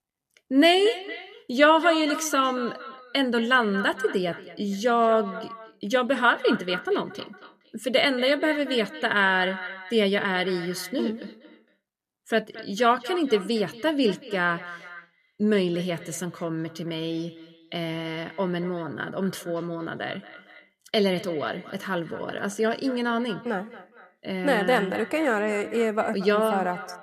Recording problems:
echo of what is said; noticeable; throughout; 230 ms later, 15 dB below the speech

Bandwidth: 14.5 kHz